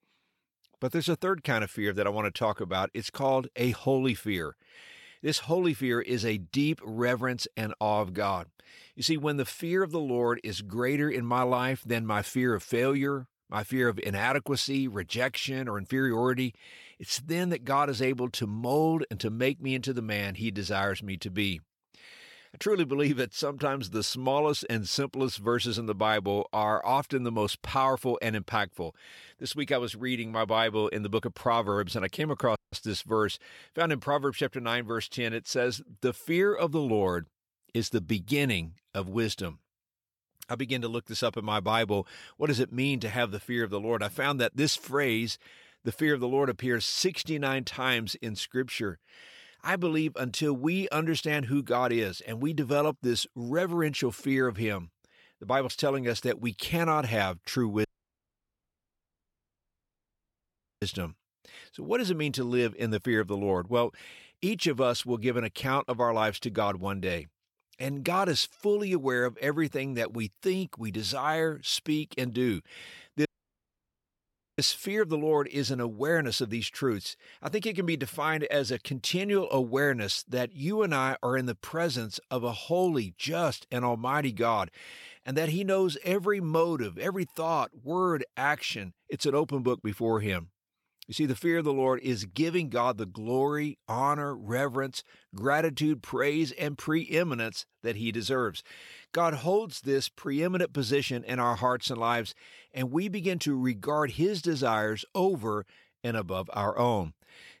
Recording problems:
audio cutting out; at 33 s, at 58 s for 3 s and at 1:13 for 1.5 s

